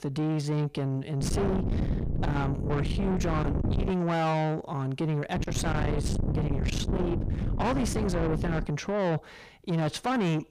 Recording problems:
distortion; heavy; 6 dB below the speech
wind noise on the microphone; heavy; from 1 to 4 s and from 5.5 to 8.5 s; 5 dB below the speech

